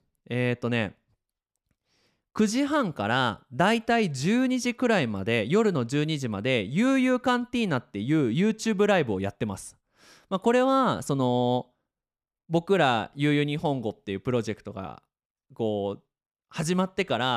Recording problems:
abrupt cut into speech; at the end

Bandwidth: 15 kHz